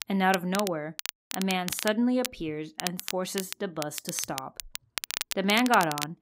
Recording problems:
crackle, like an old record; loud; 7 dB below the speech

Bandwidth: 15.5 kHz